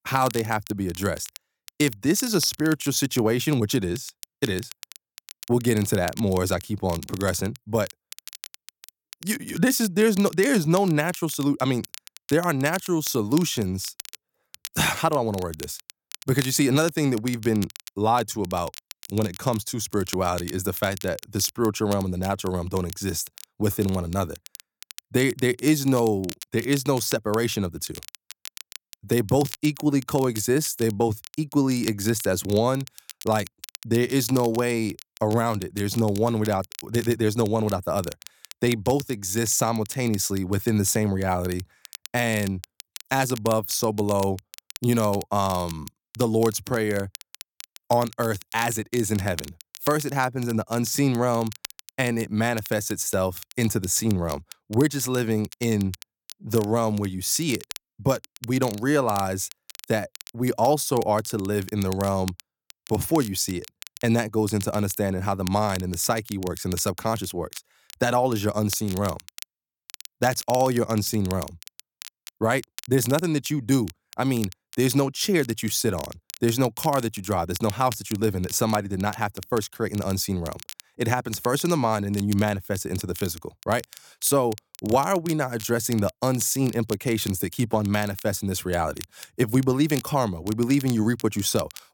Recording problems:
crackle, like an old record; noticeable; 15 dB below the speech

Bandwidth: 17.5 kHz